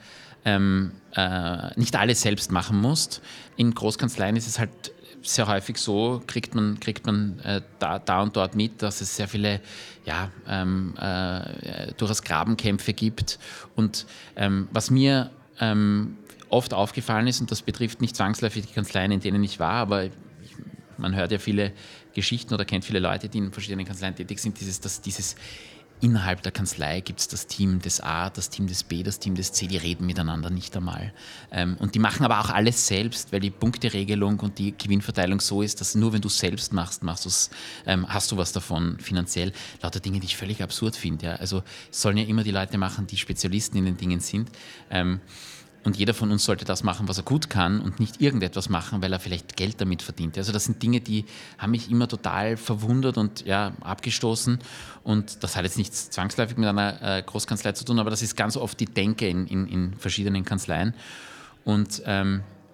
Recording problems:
chatter from many people; faint; throughout; 30 dB below the speech

